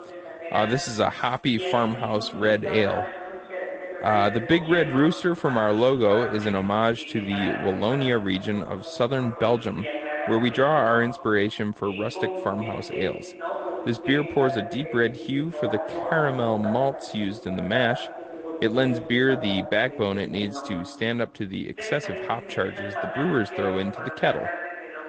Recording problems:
garbled, watery; slightly; nothing above 8 kHz
voice in the background; loud; throughout; 8 dB below the speech

